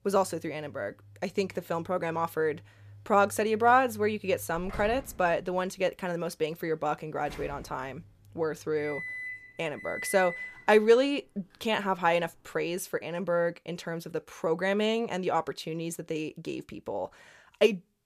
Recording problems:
household noises; noticeable; until 13 s; 15 dB below the speech

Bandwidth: 14.5 kHz